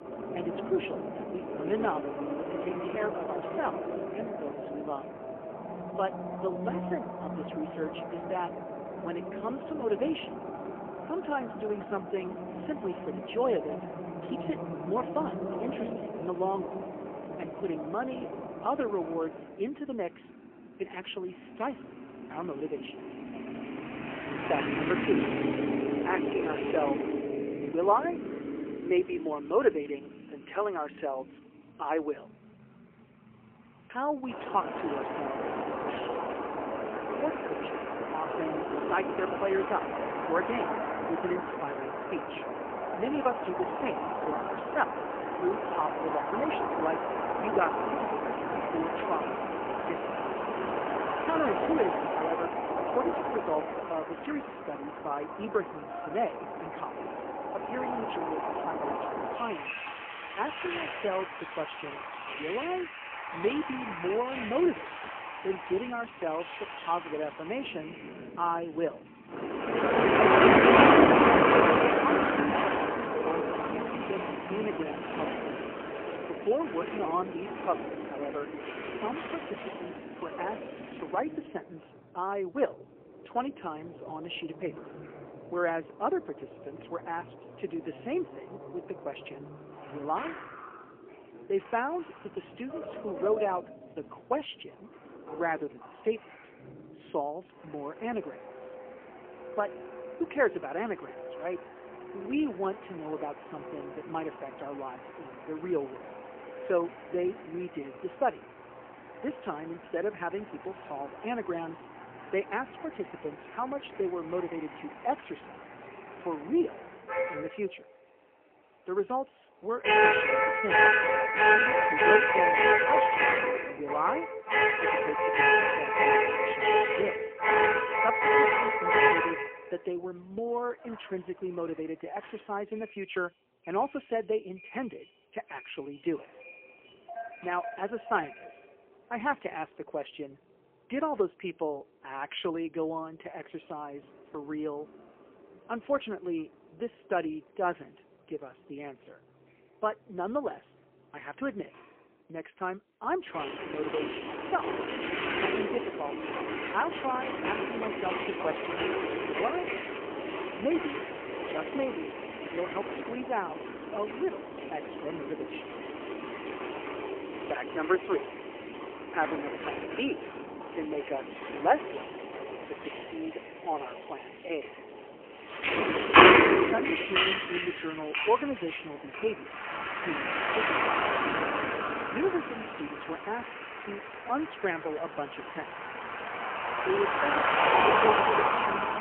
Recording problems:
phone-call audio; poor line; nothing above 3 kHz
traffic noise; very loud; throughout; 5 dB above the speech

